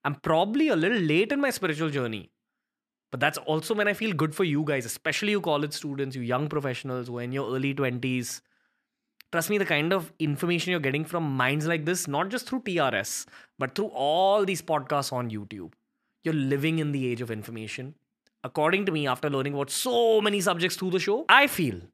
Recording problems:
none

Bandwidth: 14.5 kHz